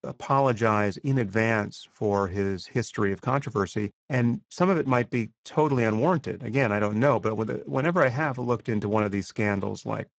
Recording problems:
garbled, watery; badly; nothing above 7.5 kHz

